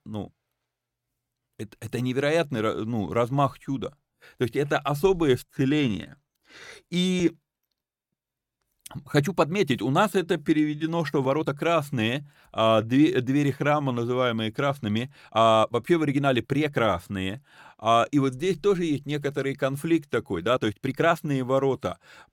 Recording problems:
uneven, jittery; strongly; from 5.5 to 21 s

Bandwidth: 17 kHz